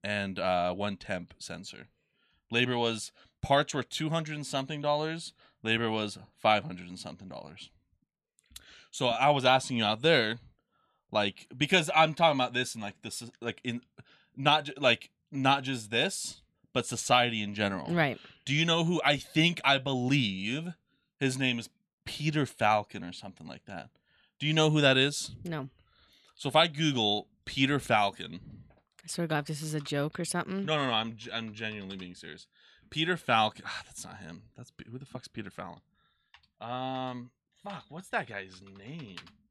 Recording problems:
none

